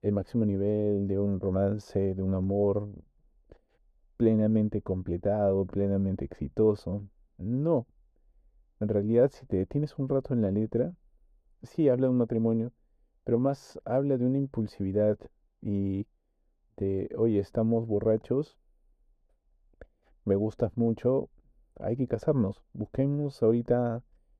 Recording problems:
muffled; very; fading above 1.5 kHz

